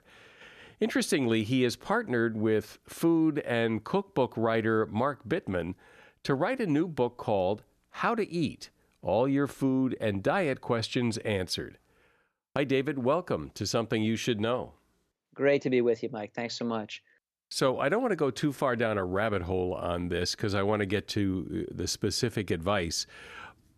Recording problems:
none

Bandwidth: 13.5 kHz